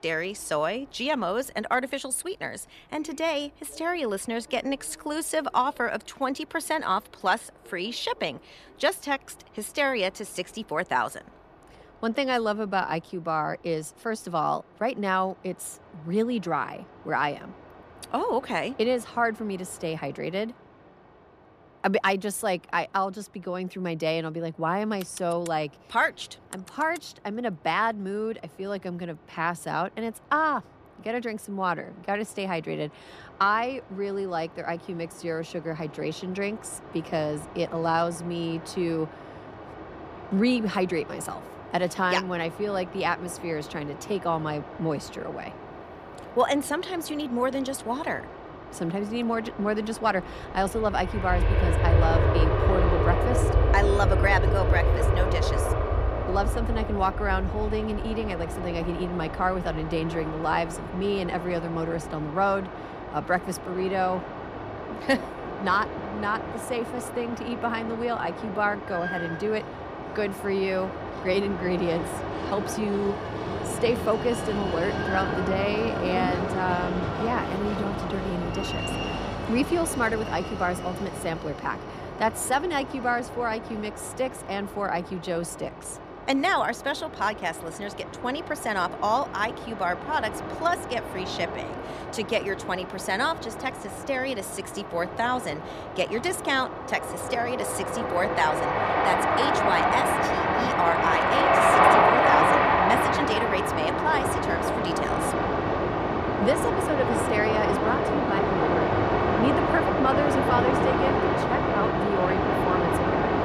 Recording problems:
train or aircraft noise; very loud; throughout; 1 dB above the speech

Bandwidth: 14.5 kHz